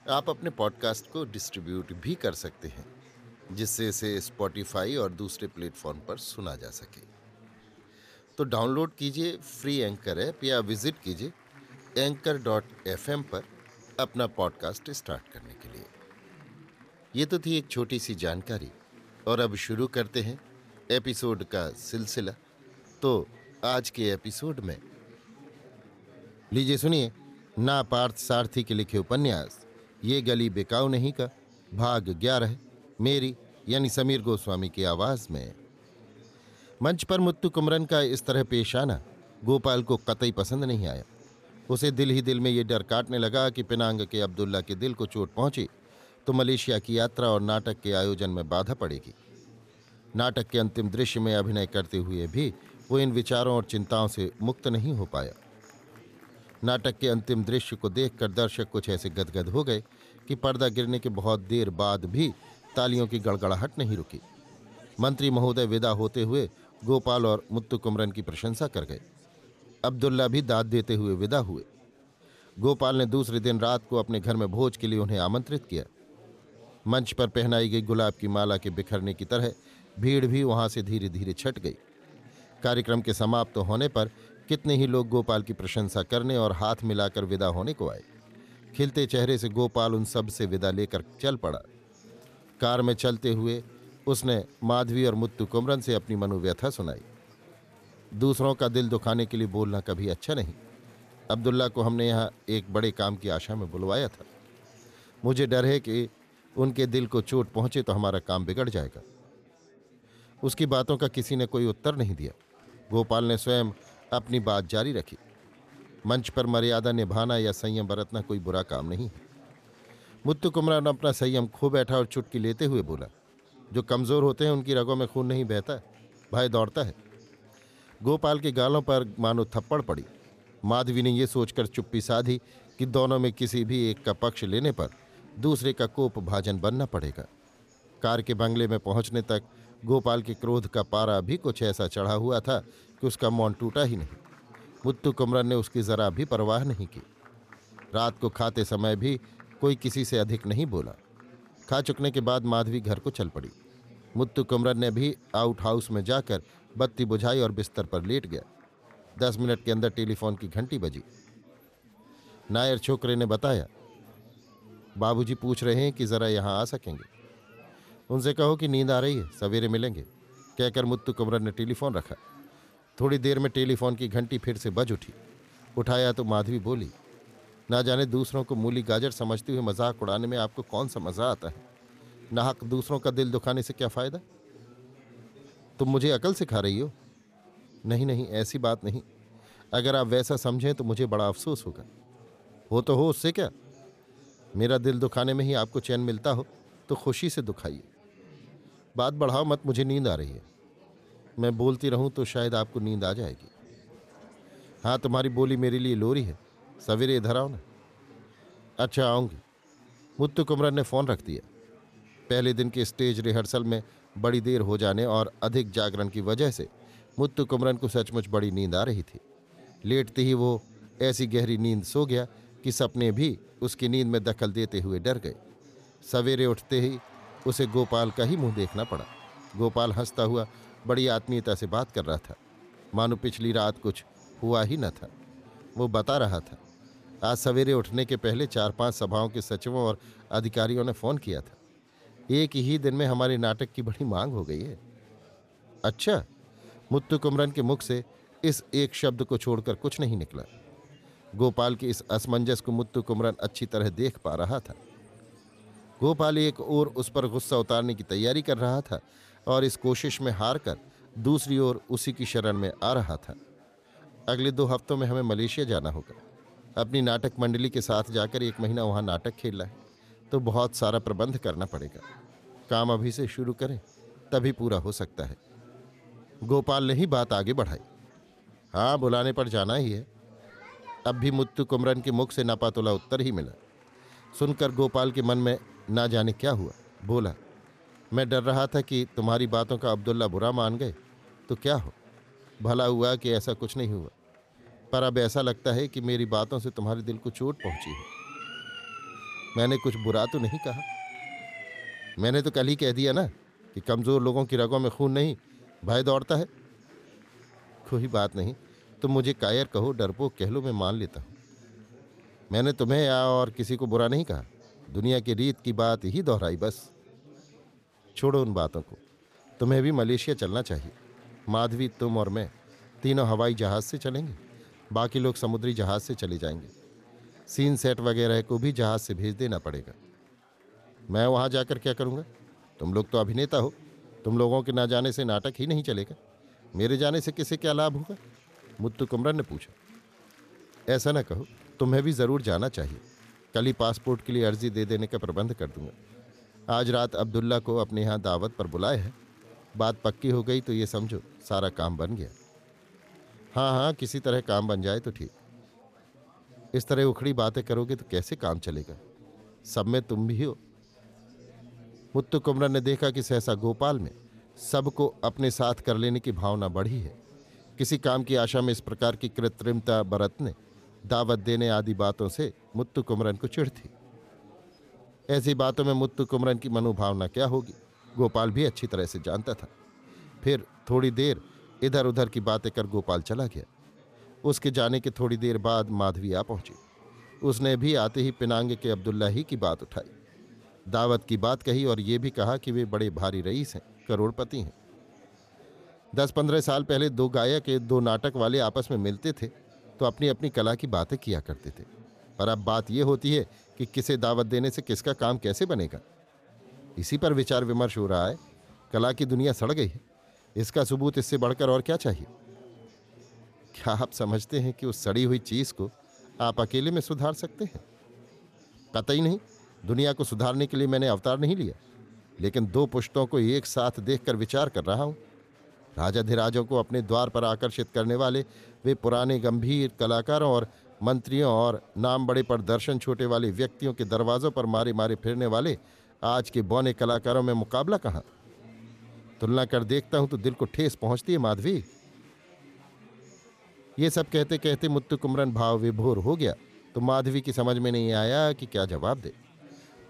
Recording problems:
chatter from many people; faint; throughout; 25 dB below the speech
siren; noticeable; from 4:58 to 5:02; peak 9 dB below the speech

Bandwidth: 14.5 kHz